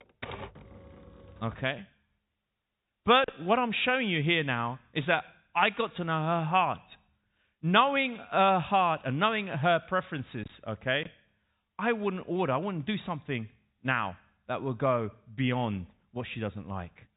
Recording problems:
high frequencies cut off; severe; nothing above 4 kHz
keyboard typing; faint; until 1.5 s; peak 10 dB below the speech

